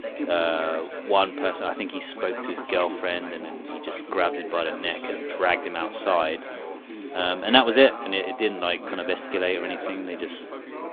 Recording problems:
phone-call audio
chatter from many people; loud; throughout; 9 dB below the speech

